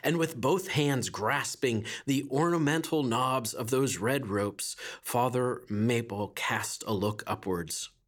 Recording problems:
none

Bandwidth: 18.5 kHz